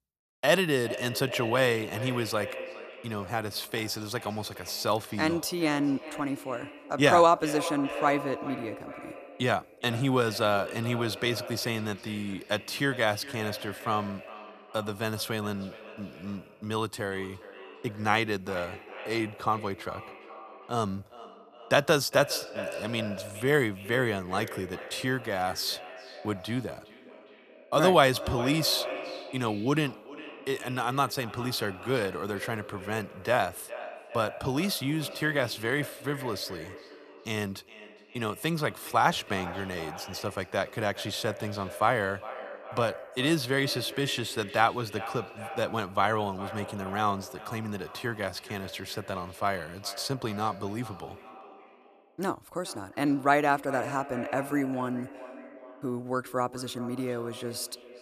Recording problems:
echo of what is said; noticeable; throughout; 410 ms later, 15 dB below the speech

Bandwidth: 14.5 kHz